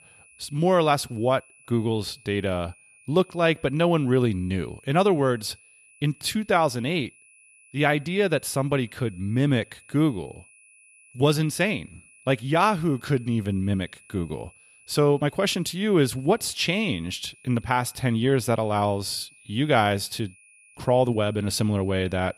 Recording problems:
high-pitched whine; faint; throughout; 2.5 kHz, 25 dB below the speech

